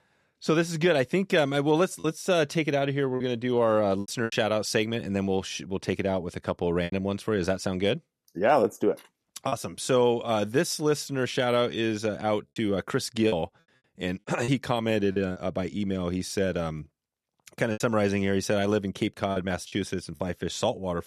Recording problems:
choppy; occasionally; 4% of the speech affected

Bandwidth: 13.5 kHz